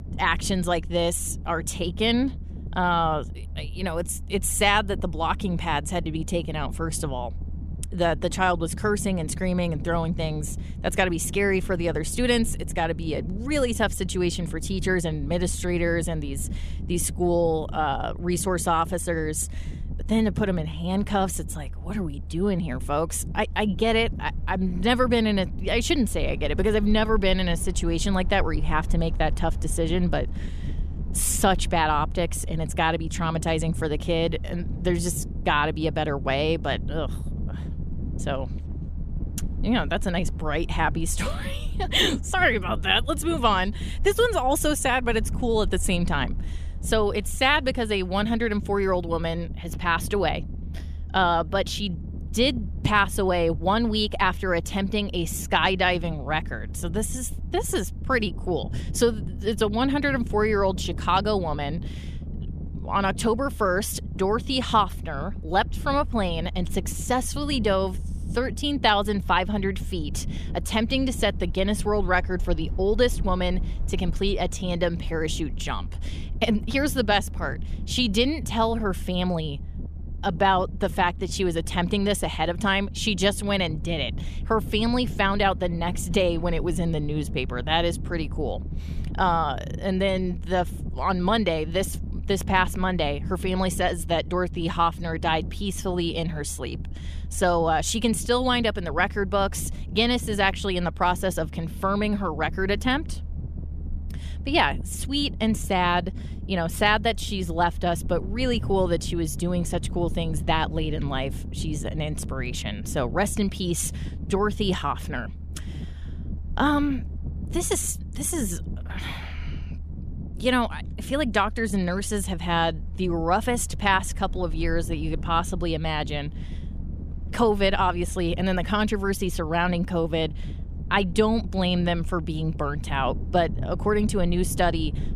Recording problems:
low rumble; faint; throughout; 20 dB below the speech

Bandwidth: 14.5 kHz